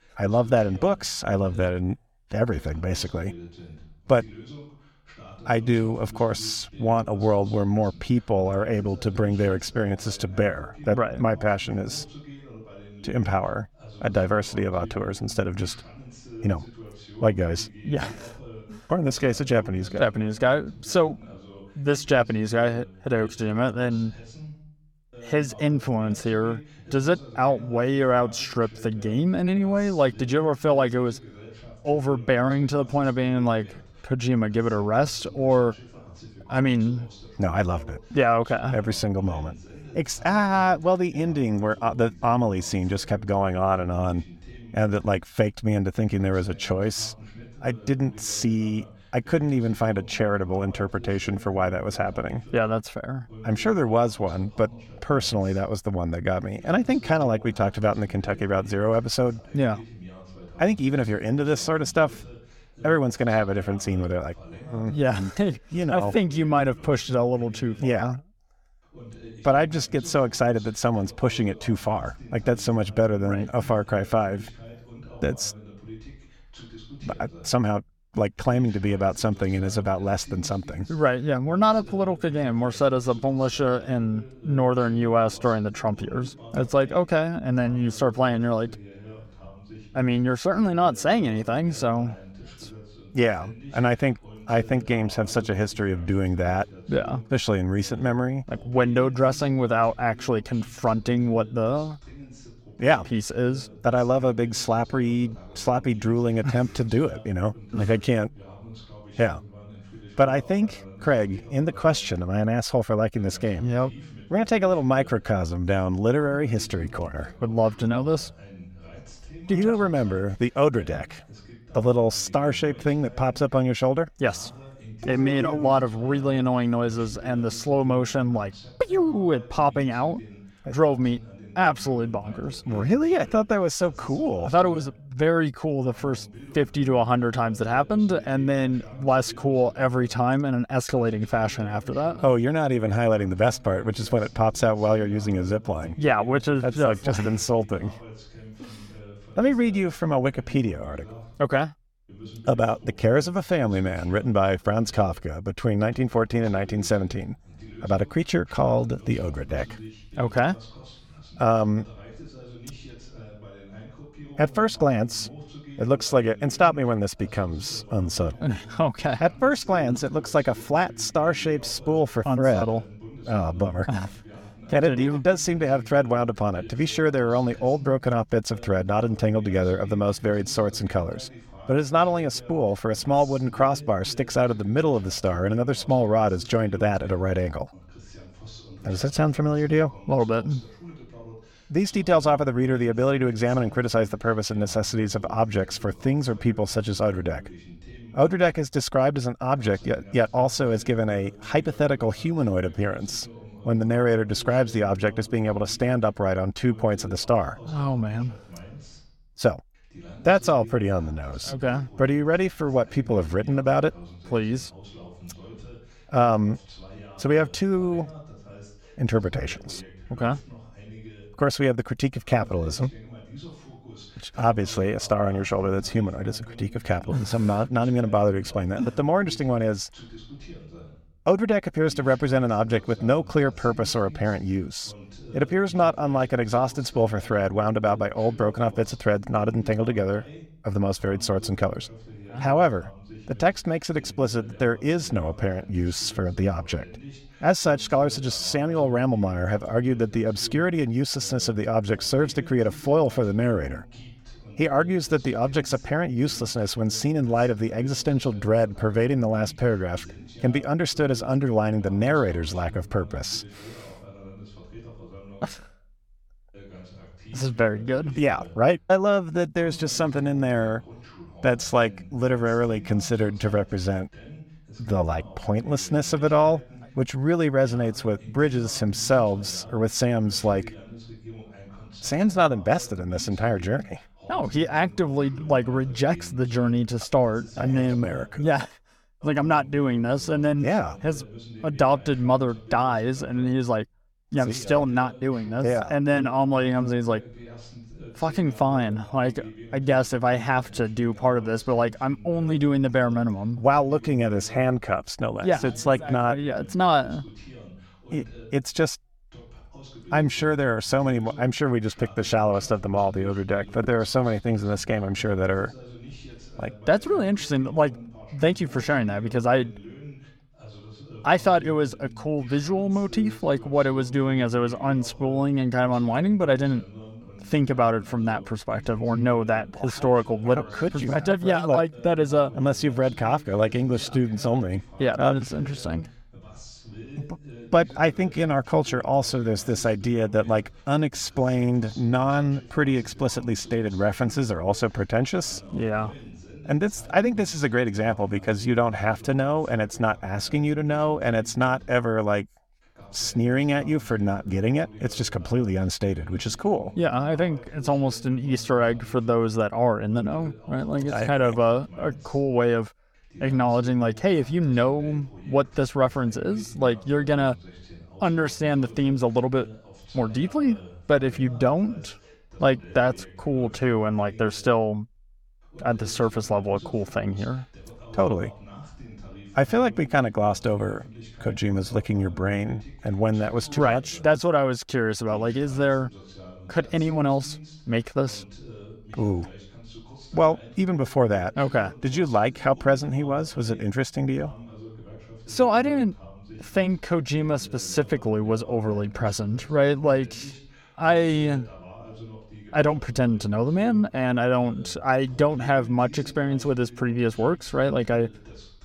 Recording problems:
voice in the background; faint; throughout; 20 dB below the speech

